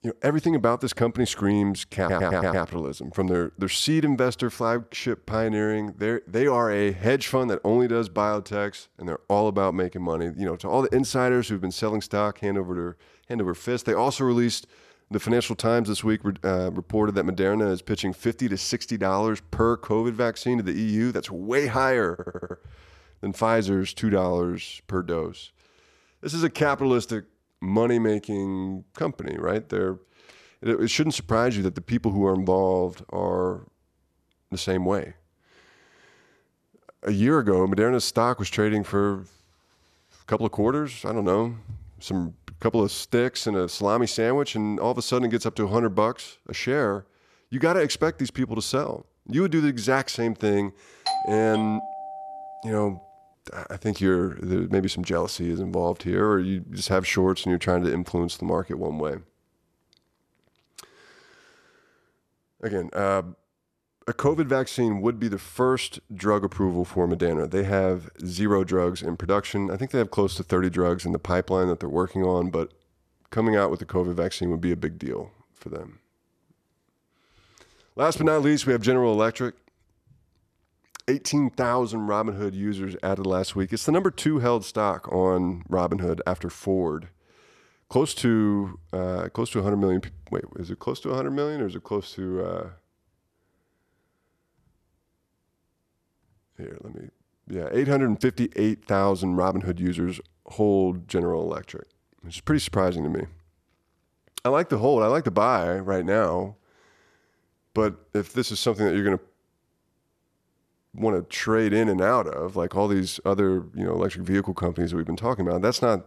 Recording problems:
audio stuttering; at 2 s and at 22 s
doorbell; noticeable; from 51 to 53 s; peak 2 dB below the speech

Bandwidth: 13.5 kHz